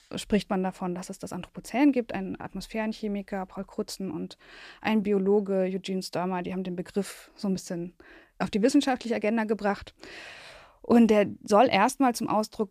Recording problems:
none

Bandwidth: 14.5 kHz